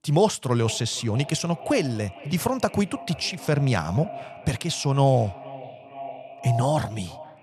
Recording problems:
echo of what is said; noticeable; throughout; 470 ms later, 15 dB below the speech

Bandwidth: 13.5 kHz